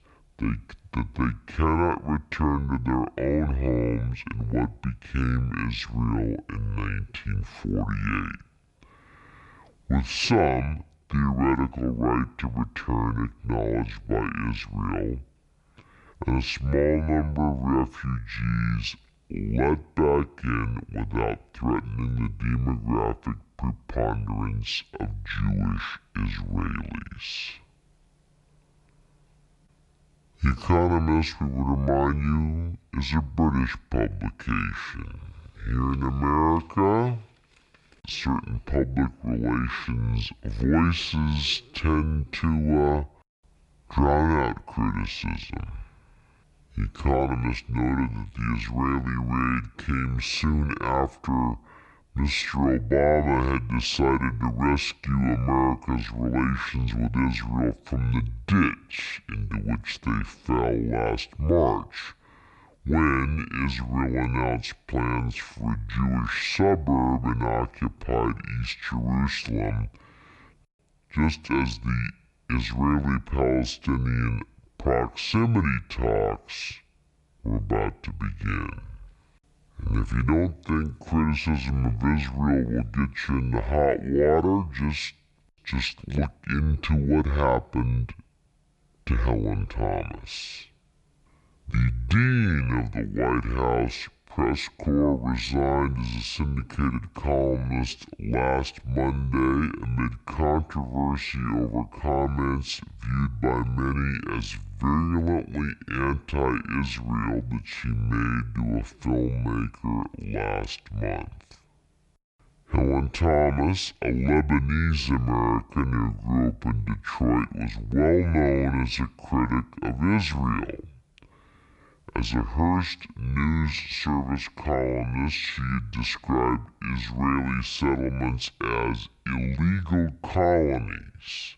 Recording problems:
wrong speed and pitch; too slow and too low; 0.6 times normal speed

